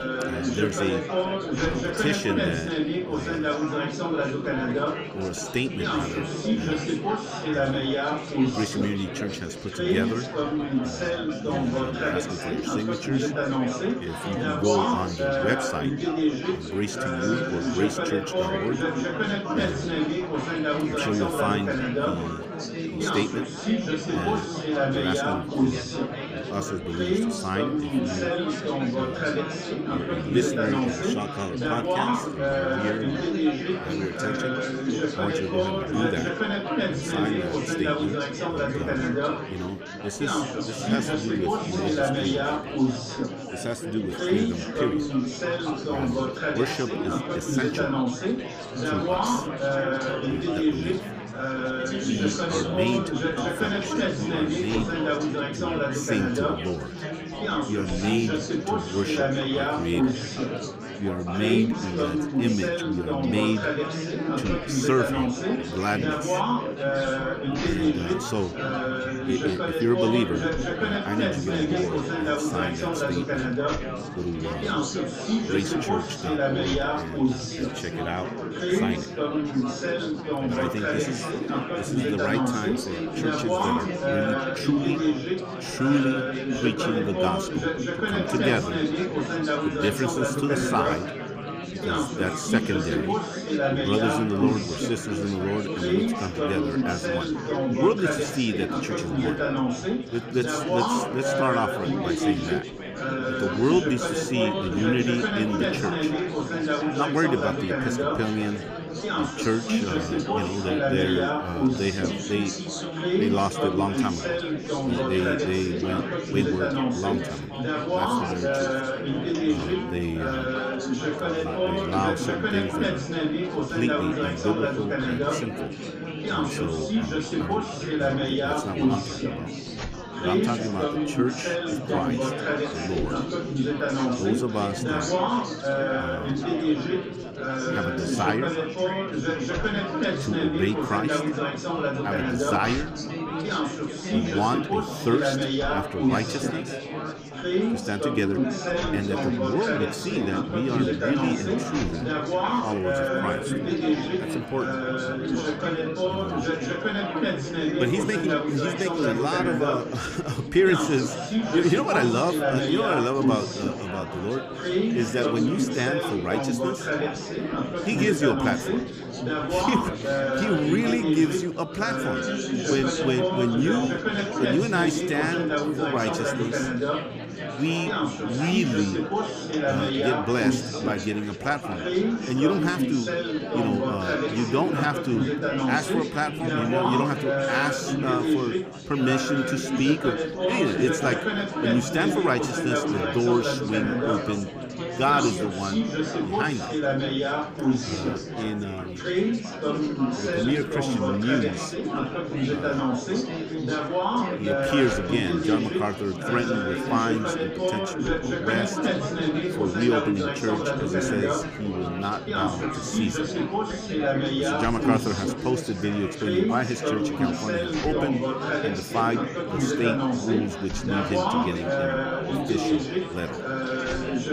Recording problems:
chatter from many people; very loud; throughout; 2 dB above the speech

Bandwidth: 15 kHz